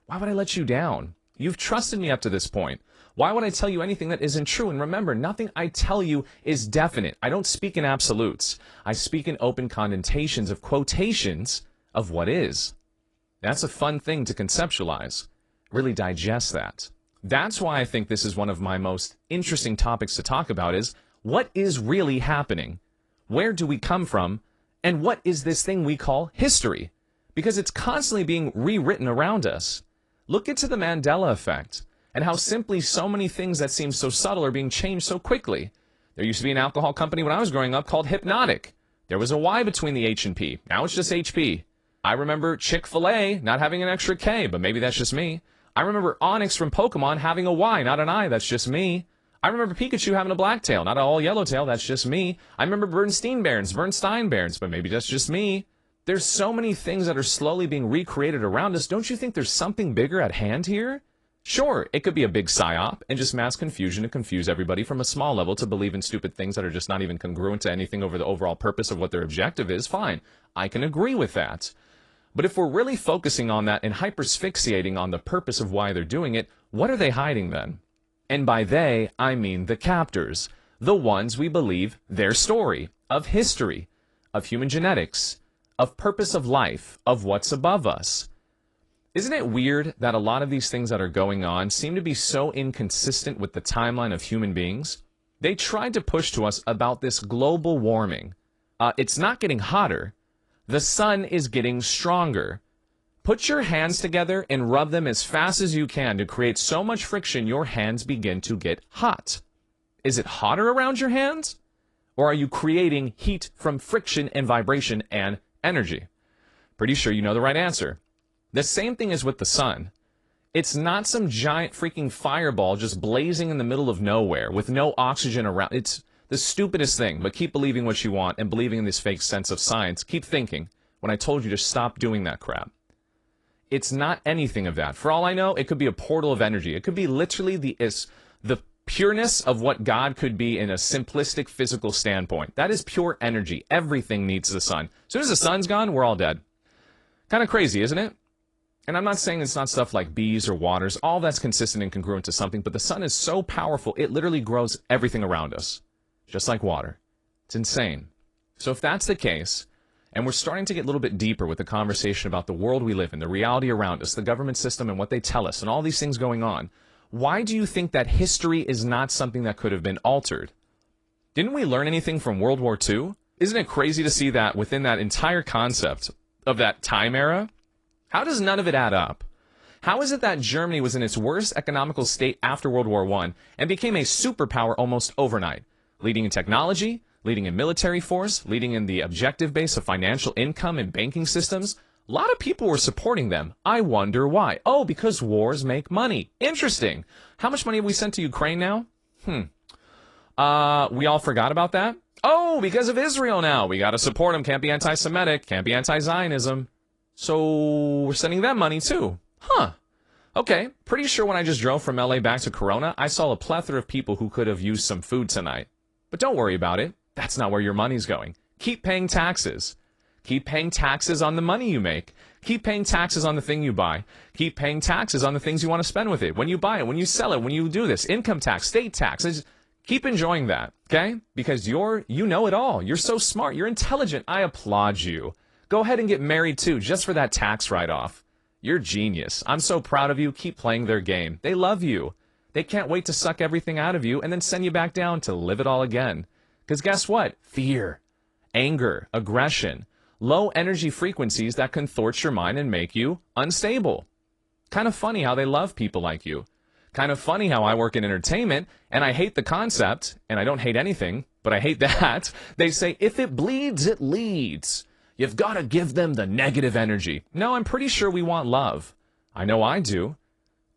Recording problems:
garbled, watery; slightly

